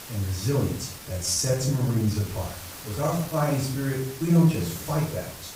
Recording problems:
off-mic speech; far
room echo; noticeable; dies away in 0.4 s
hiss; noticeable; throughout; 15 dB below the speech
uneven, jittery; strongly; from 1 to 5 s

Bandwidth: 15.5 kHz